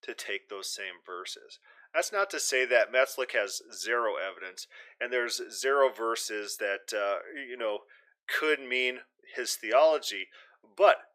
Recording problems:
thin; very; fading below 400 Hz

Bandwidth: 15 kHz